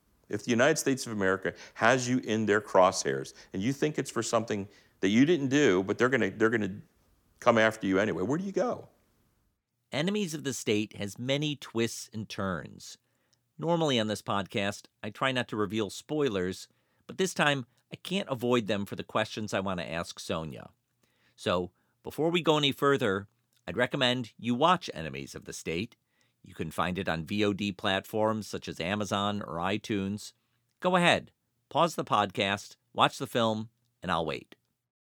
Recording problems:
none

